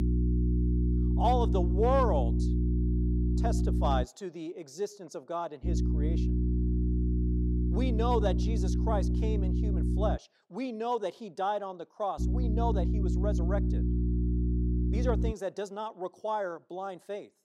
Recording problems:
electrical hum; loud; until 4 s, from 5.5 to 10 s and from 12 to 15 s; 60 Hz, 6 dB below the speech

